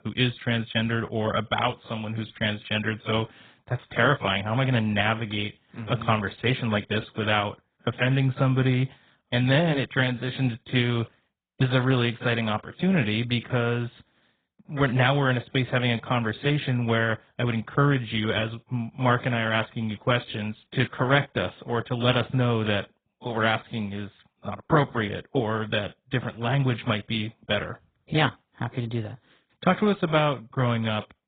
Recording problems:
garbled, watery; badly; nothing above 3.5 kHz

